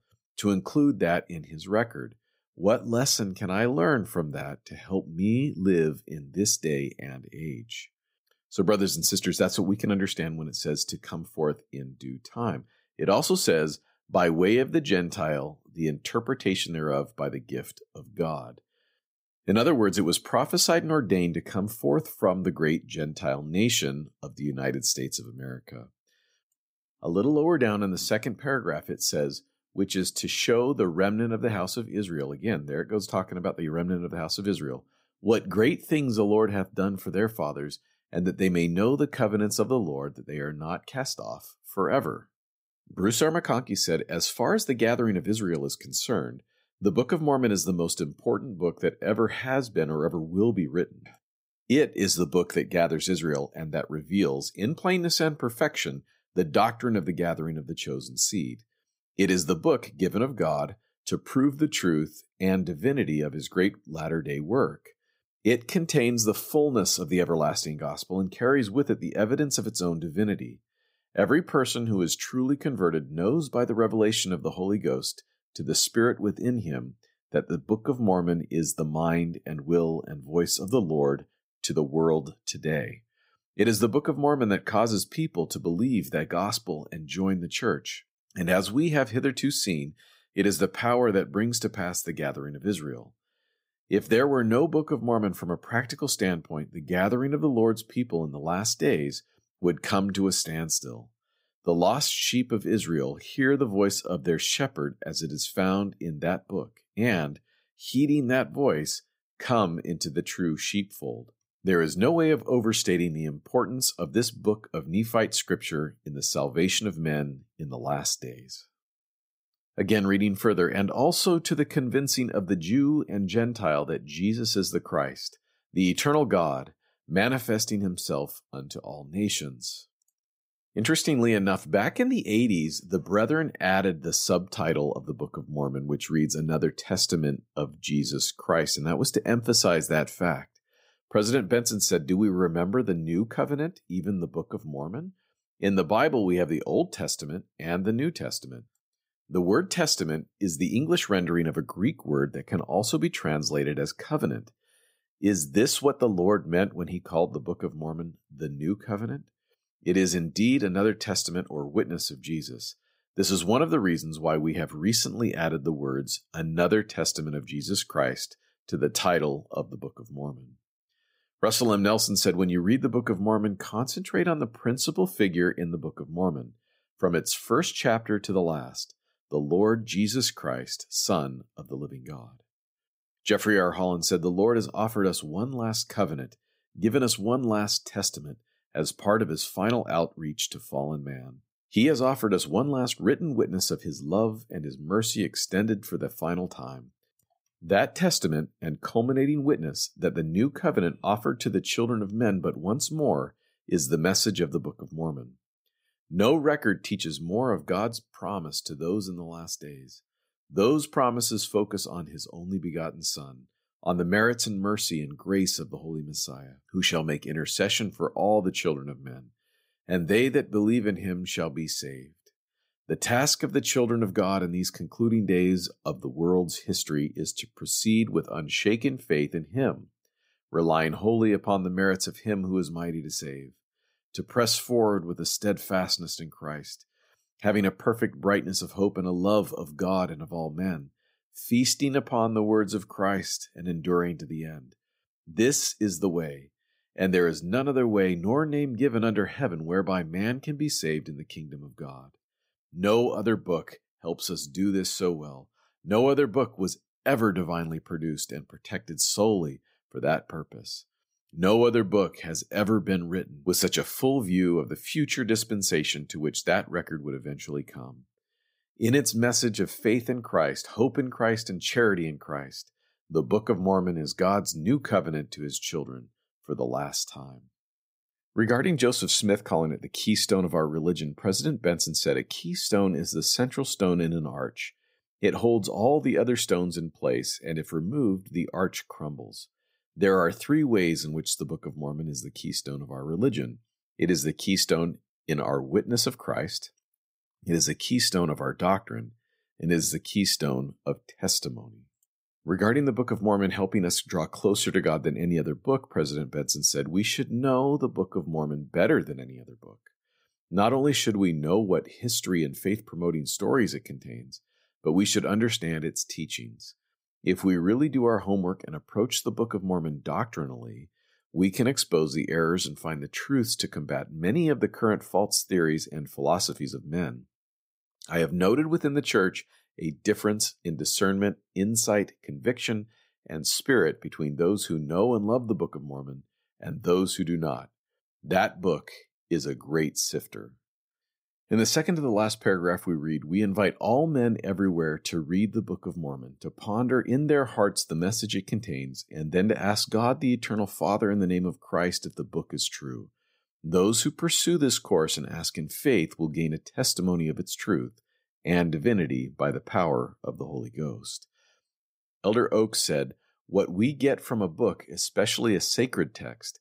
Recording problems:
none

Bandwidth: 15.5 kHz